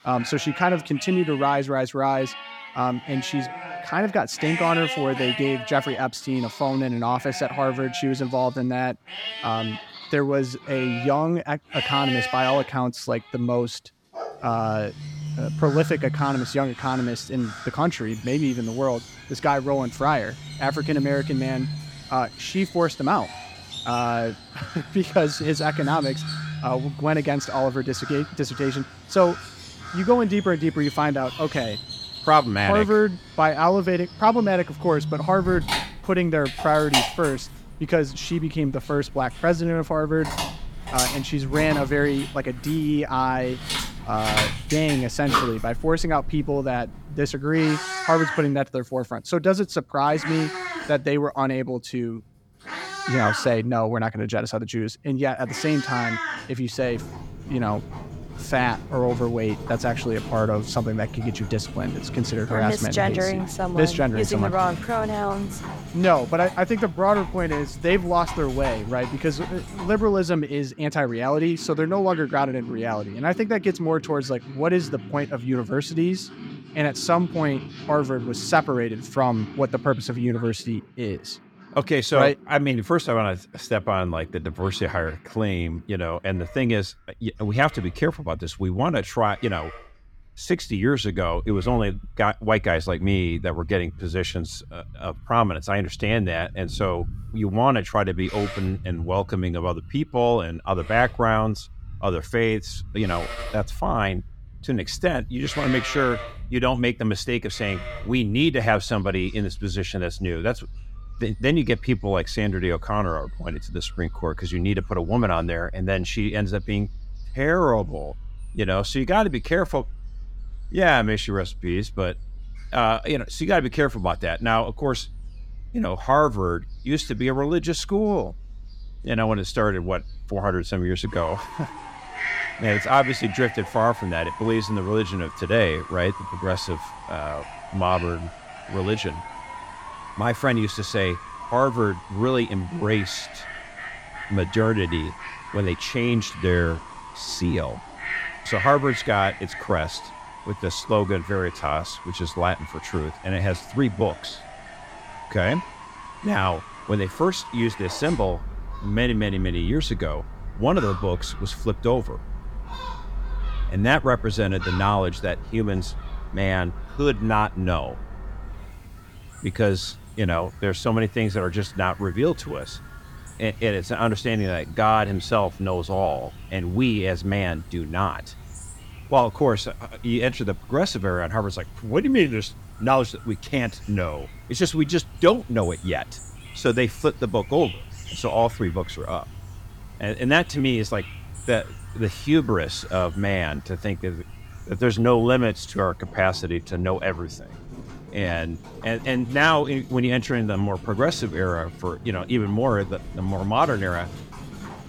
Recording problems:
animal sounds; noticeable; throughout; 10 dB below the speech

